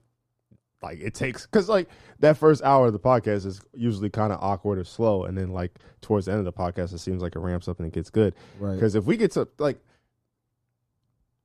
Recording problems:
muffled; slightly; fading above 1.5 kHz

